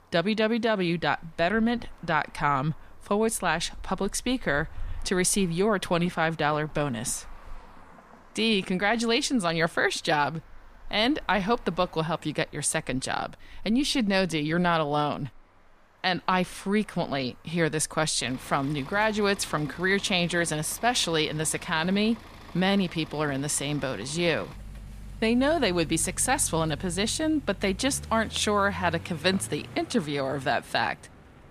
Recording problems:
traffic noise; faint; throughout; 20 dB below the speech

